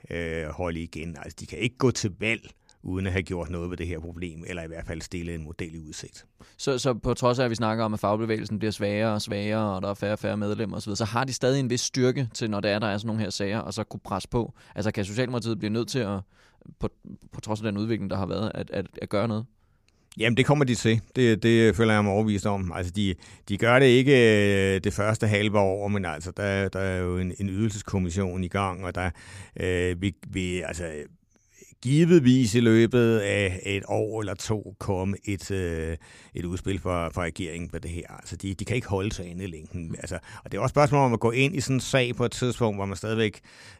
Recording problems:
none

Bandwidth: 15 kHz